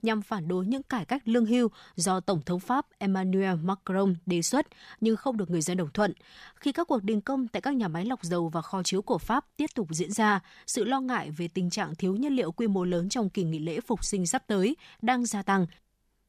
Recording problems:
none

